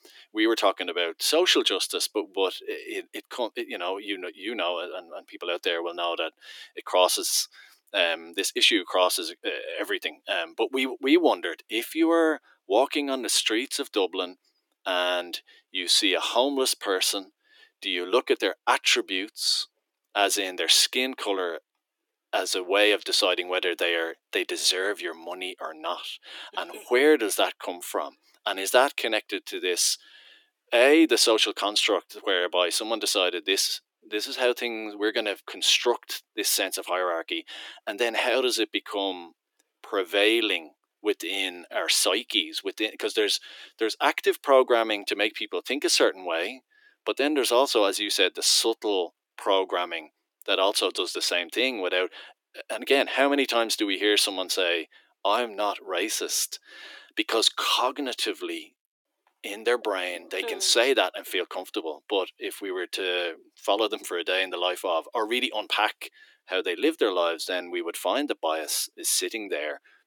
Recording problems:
thin; somewhat; fading below 300 Hz

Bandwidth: 17.5 kHz